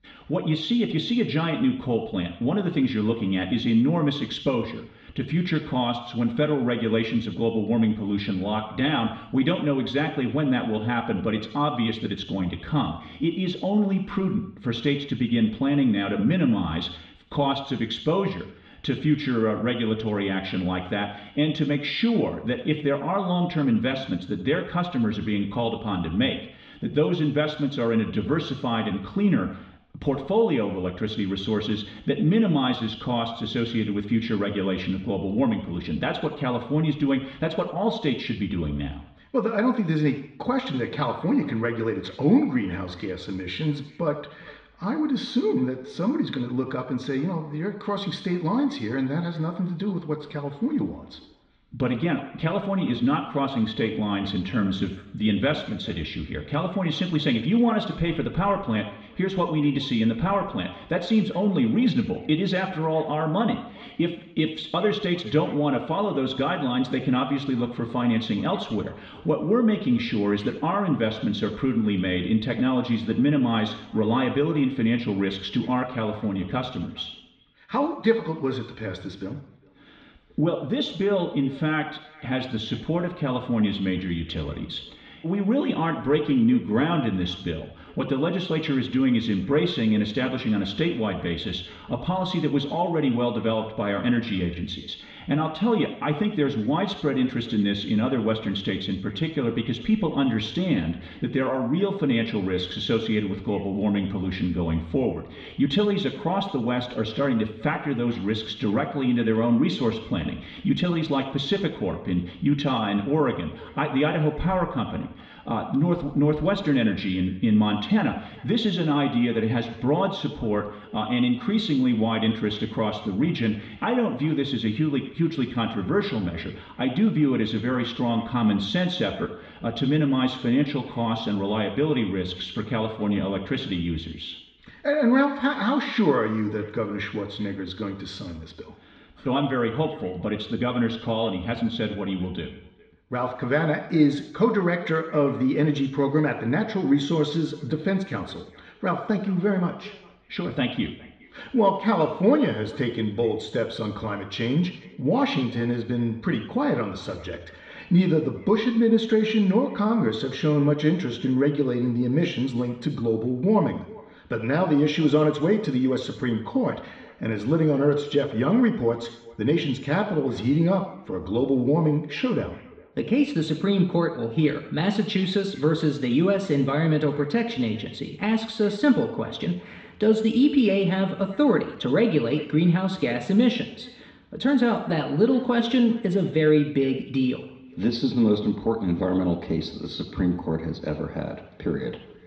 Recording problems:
muffled; slightly; fading above 3.5 kHz
echo of what is said; faint; from 41 s on; 410 ms later, 25 dB below the speech
room echo; slight; dies away in 0.7 s
off-mic speech; somewhat distant

